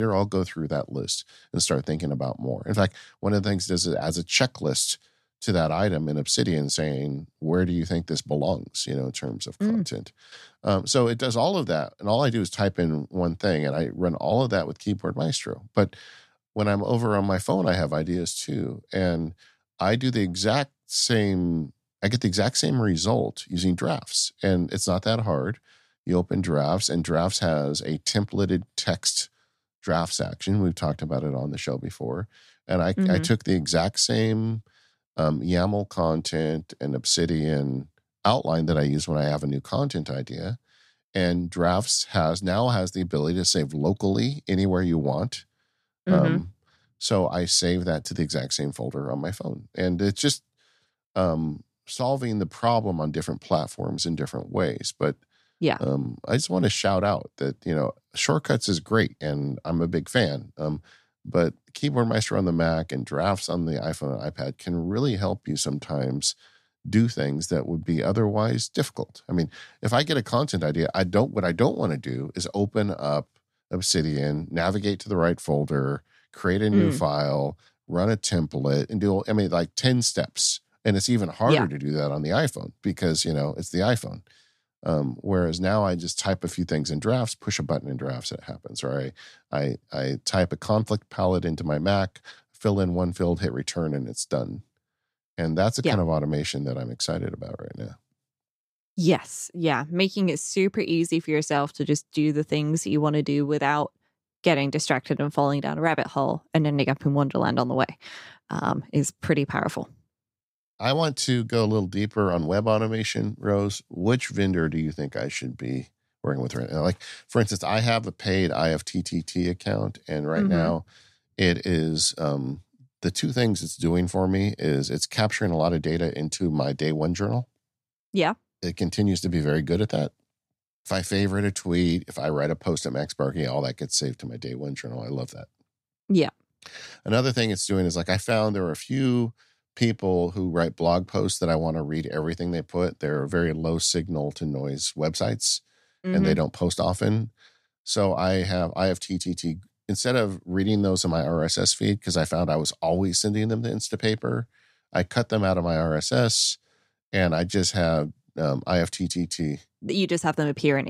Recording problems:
abrupt cut into speech; at the start and the end

